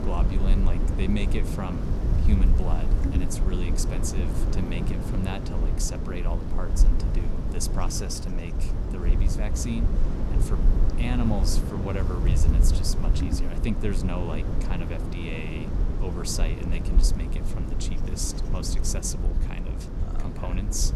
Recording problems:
wind noise on the microphone; heavy; 3 dB below the speech

